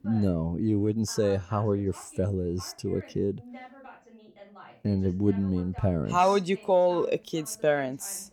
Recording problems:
voice in the background; faint; throughout; 20 dB below the speech

